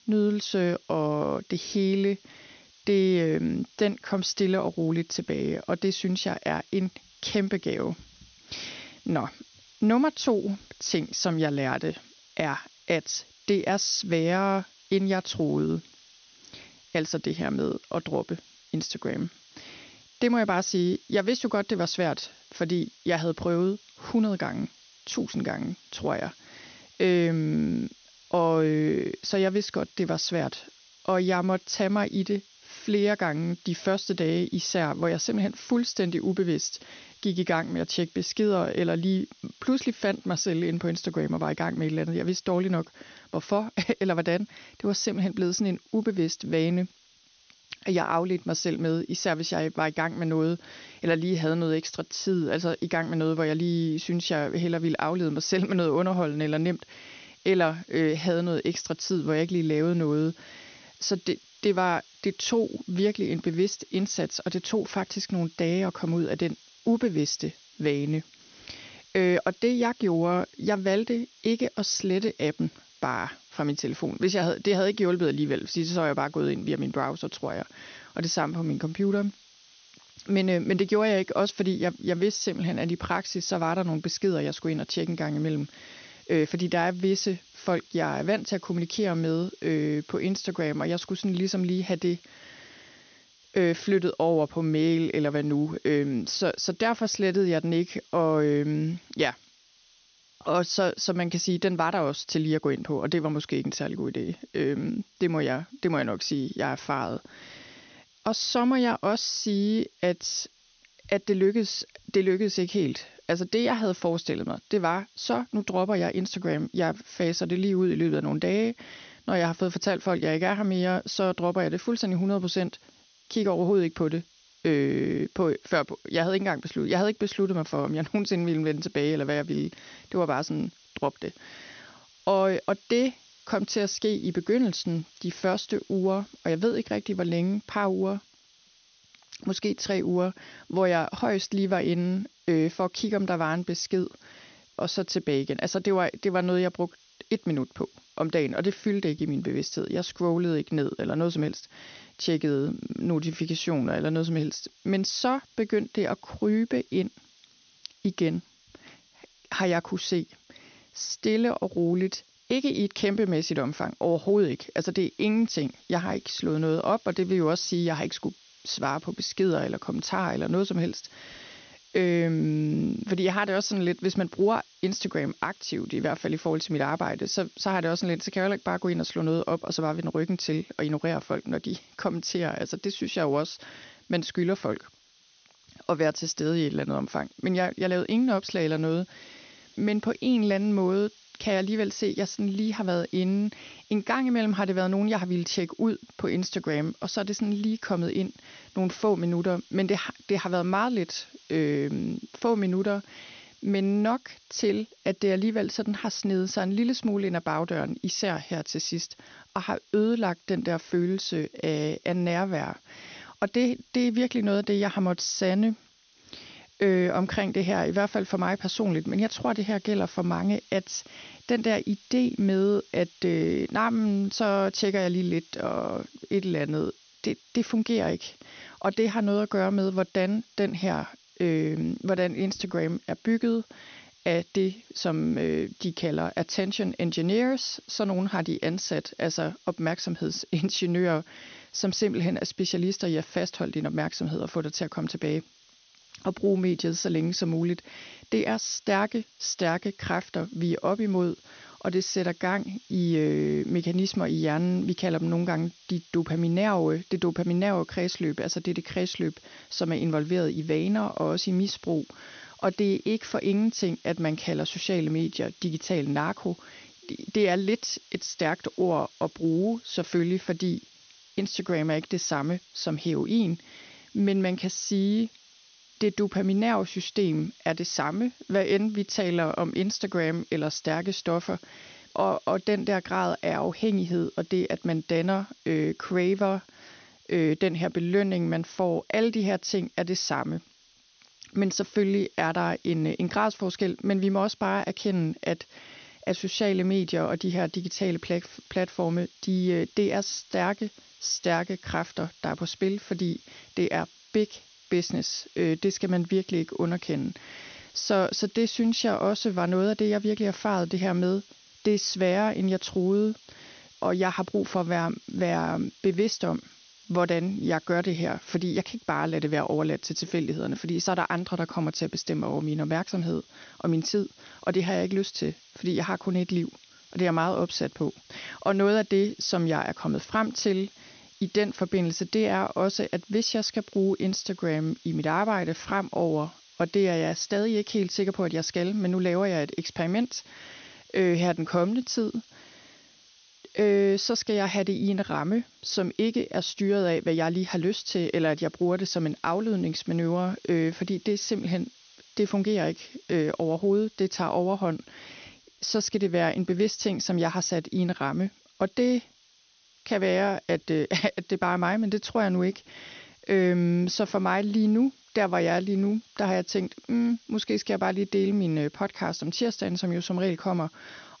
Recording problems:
high frequencies cut off; noticeable; nothing above 6.5 kHz
hiss; faint; throughout; 25 dB below the speech

